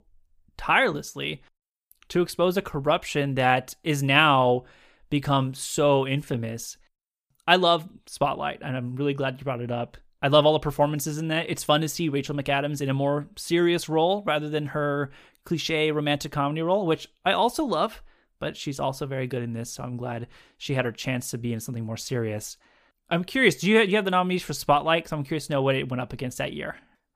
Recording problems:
none

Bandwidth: 15 kHz